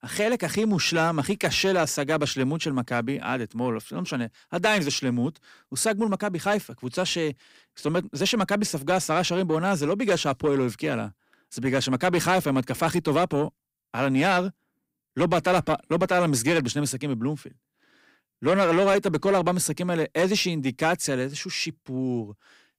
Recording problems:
distortion; slight; 10 dB below the speech

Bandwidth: 15.5 kHz